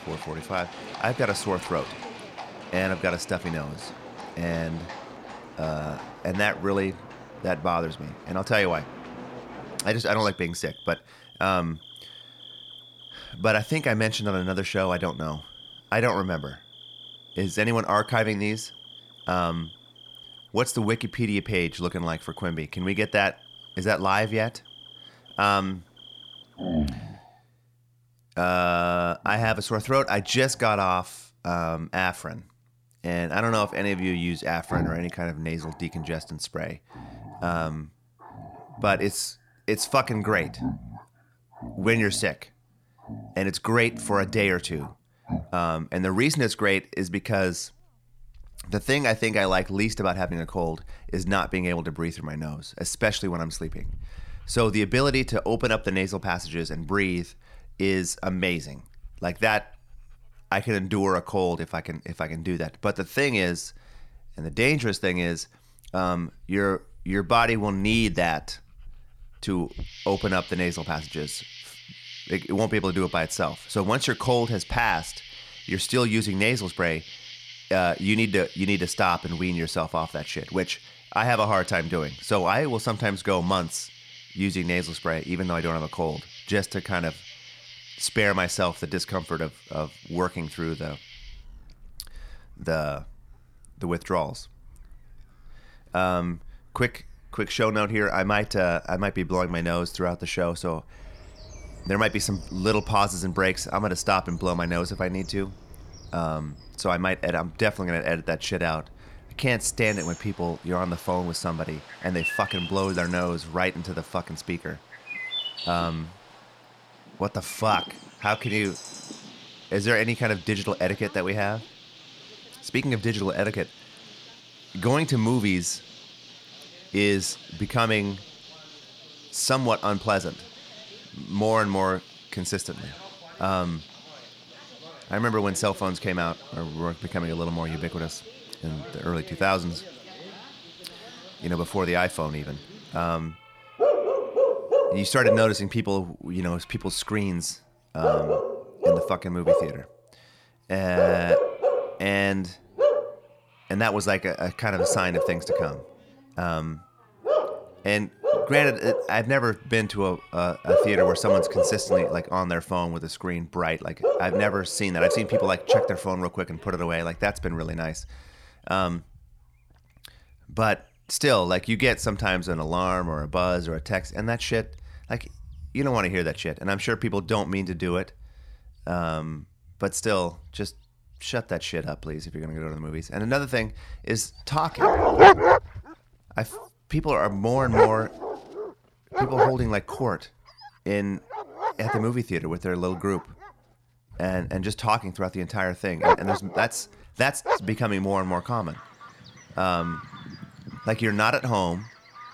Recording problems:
animal sounds; loud; throughout; 3 dB below the speech

